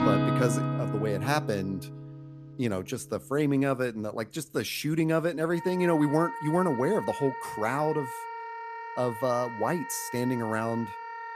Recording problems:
background music; loud; throughout; 6 dB below the speech

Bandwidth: 14.5 kHz